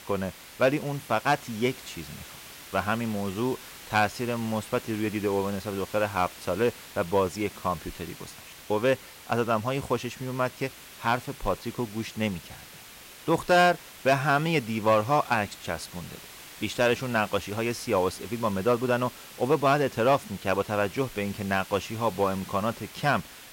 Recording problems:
hiss; noticeable; throughout; 15 dB below the speech

